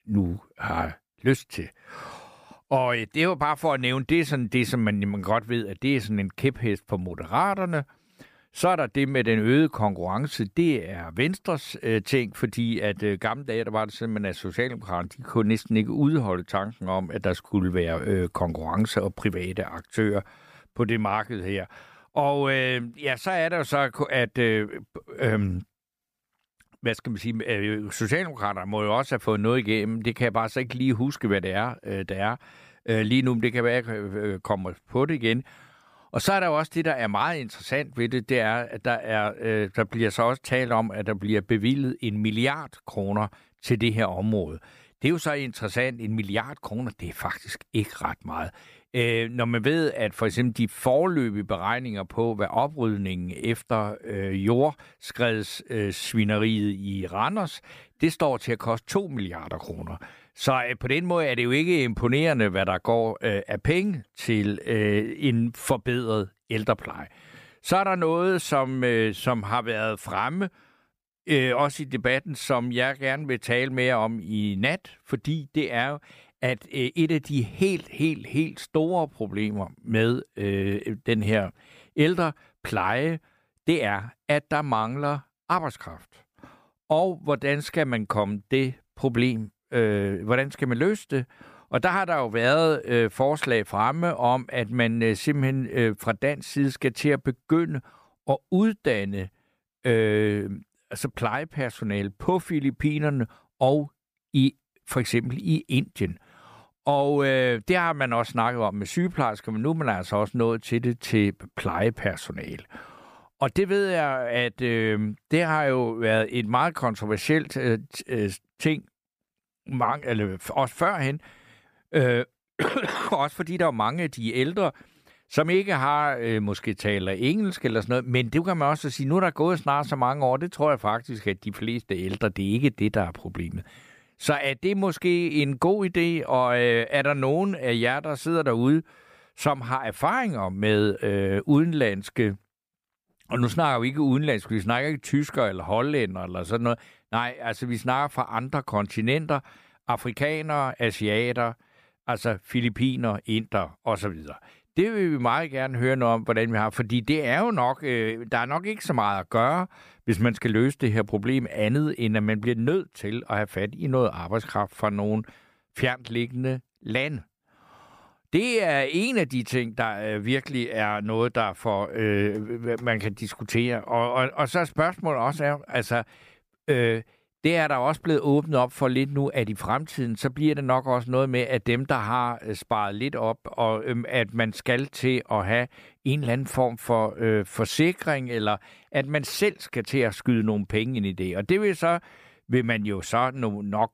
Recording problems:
none

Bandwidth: 15 kHz